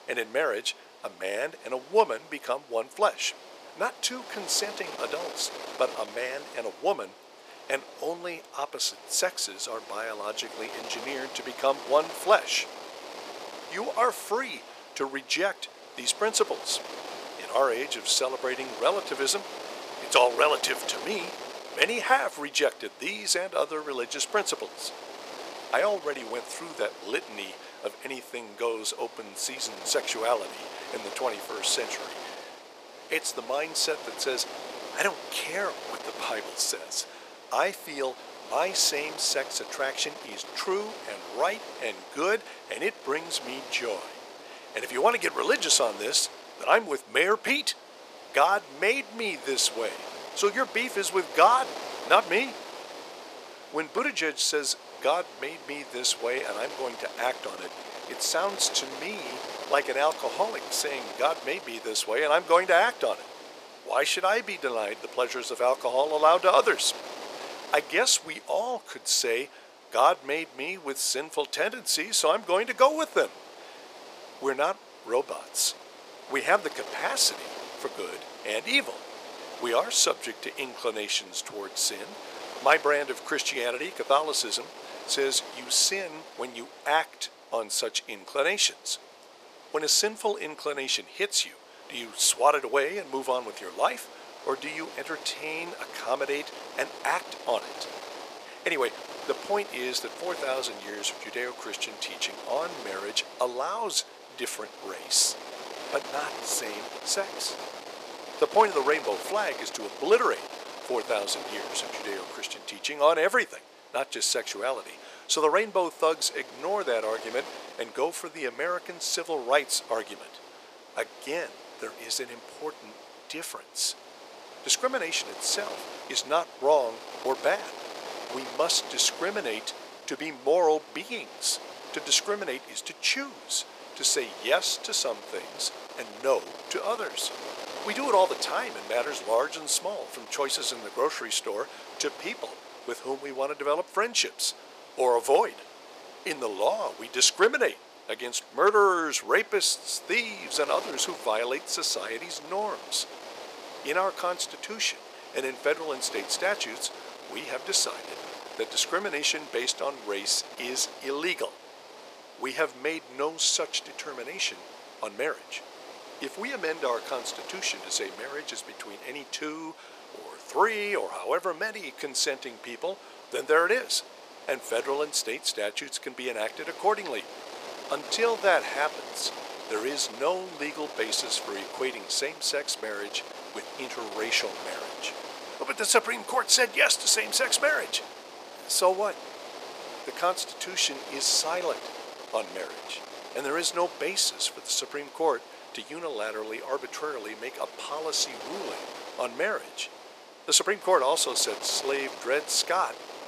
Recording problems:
thin; very; fading below 500 Hz
wind noise on the microphone; occasional gusts; 15 dB below the speech

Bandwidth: 14.5 kHz